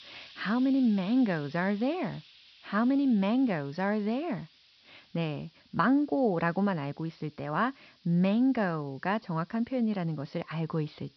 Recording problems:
high frequencies cut off; noticeable; nothing above 5.5 kHz
hiss; faint; throughout; 25 dB below the speech

